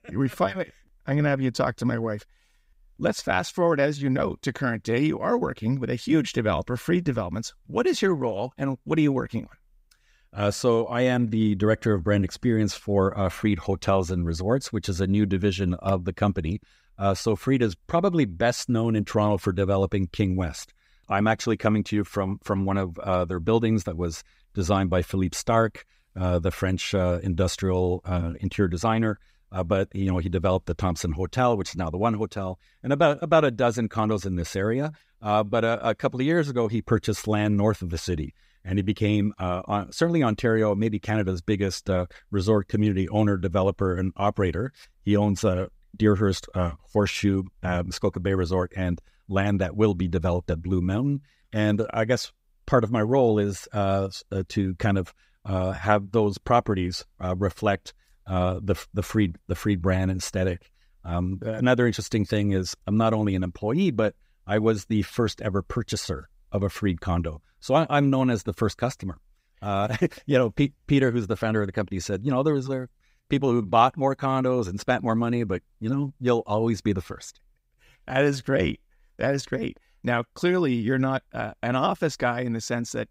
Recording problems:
none

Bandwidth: 15.5 kHz